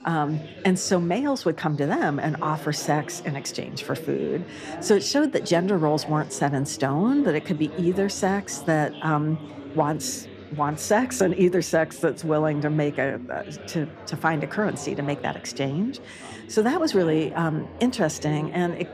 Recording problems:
background chatter; noticeable; throughout; 4 voices, 15 dB below the speech

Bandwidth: 14.5 kHz